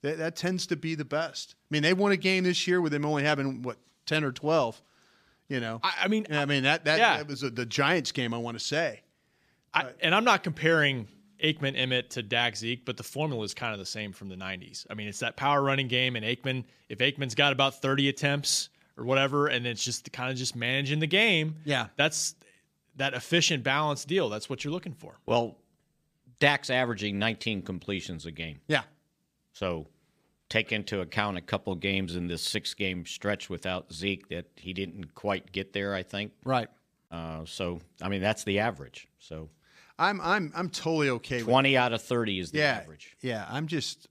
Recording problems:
none

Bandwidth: 15 kHz